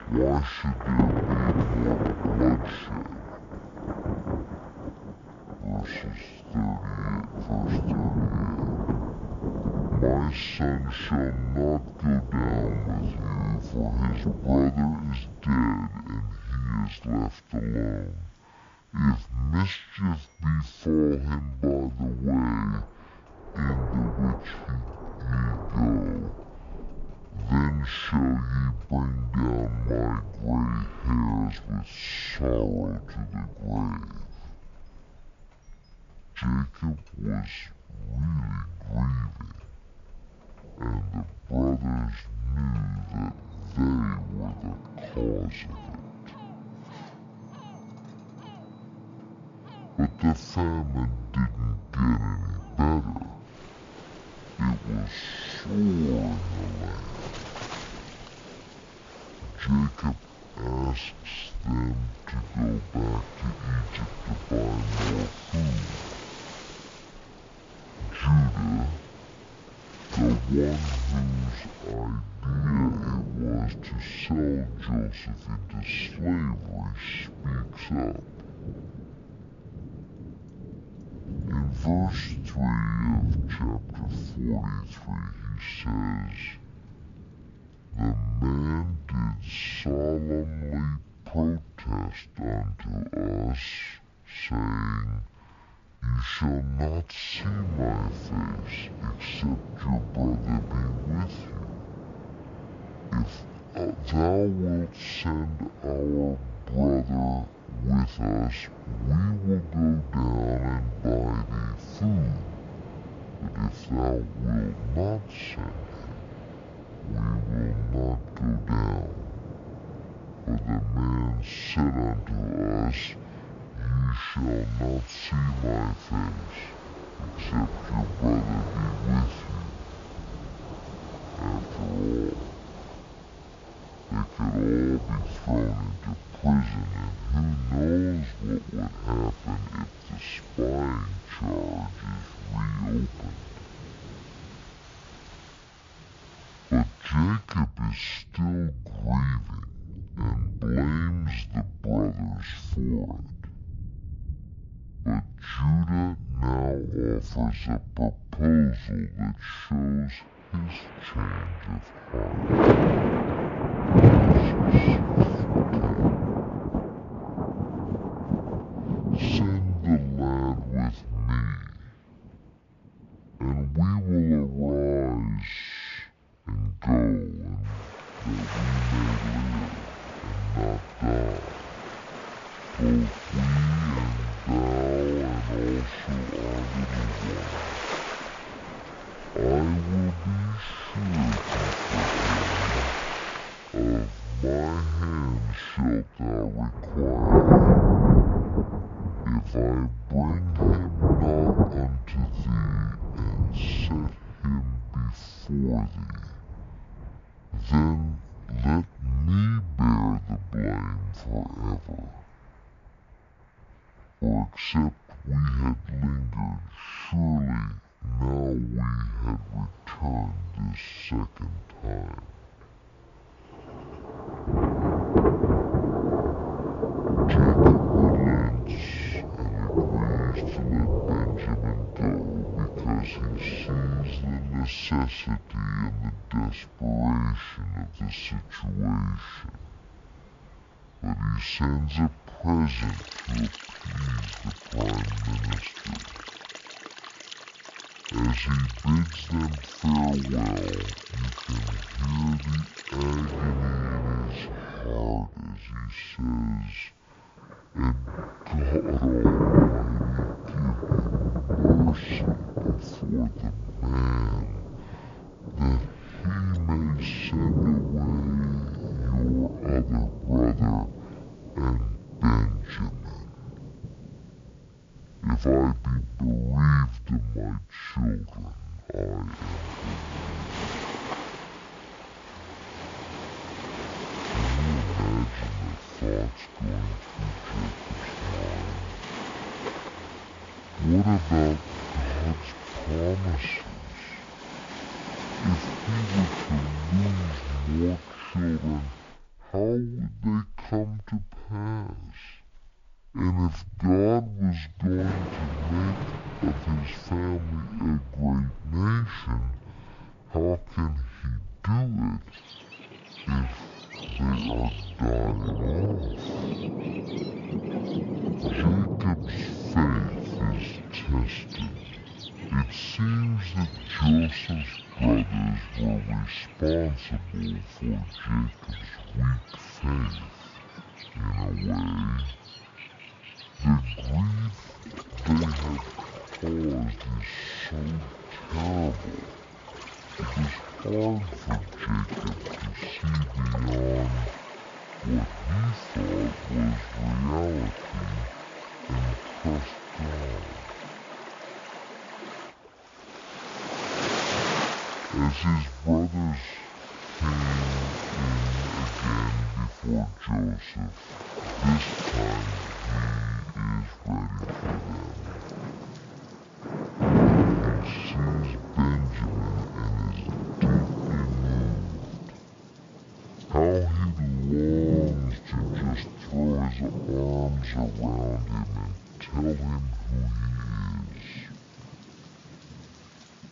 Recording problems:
wrong speed and pitch; too slow and too low; 0.5 times normal speed
rain or running water; loud; throughout; 2 dB below the speech

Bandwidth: 7 kHz